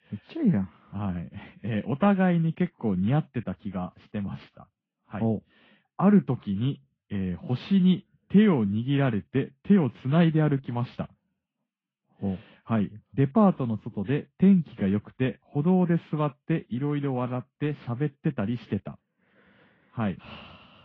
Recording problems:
garbled, watery; slightly; nothing above 8 kHz
muffled; very slightly; fading above 3 kHz

